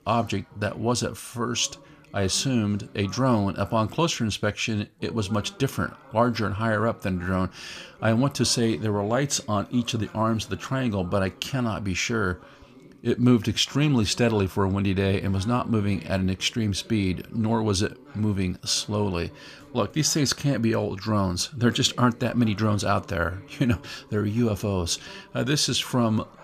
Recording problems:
voice in the background; faint; throughout; 25 dB below the speech

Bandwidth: 14.5 kHz